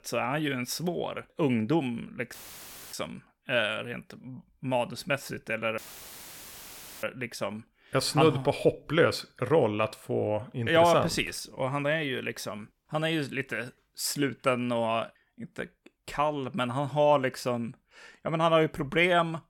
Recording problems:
audio cutting out; filled with static; at 2.5 s for 0.5 s and at 6 s for 1.5 s

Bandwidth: 17 kHz